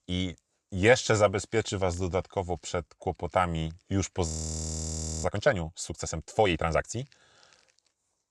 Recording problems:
audio freezing; at 4.5 s for 1 s

